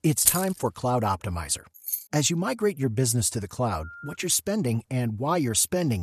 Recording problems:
jangling keys; loud; at 0.5 s; peak 4 dB above the speech
jangling keys; noticeable; at 2 s; peak 5 dB below the speech
phone ringing; faint; at 4 s; peak 15 dB below the speech
abrupt cut into speech; at the end

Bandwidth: 13.5 kHz